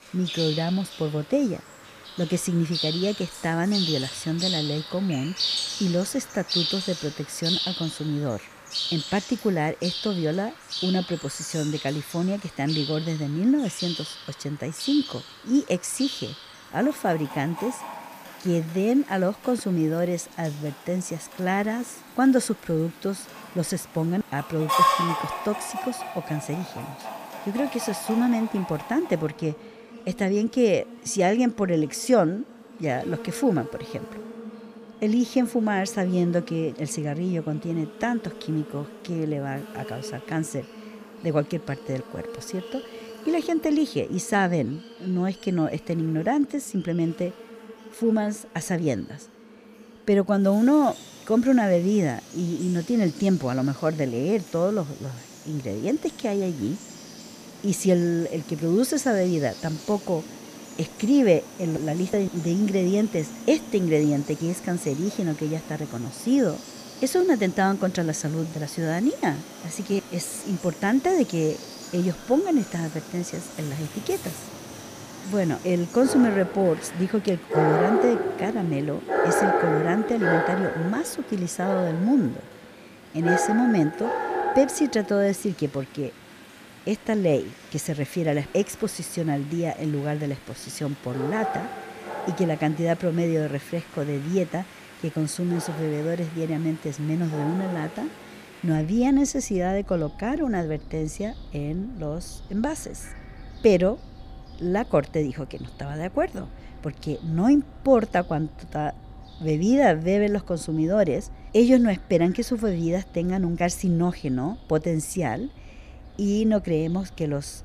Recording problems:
animal sounds; loud; throughout; 8 dB below the speech

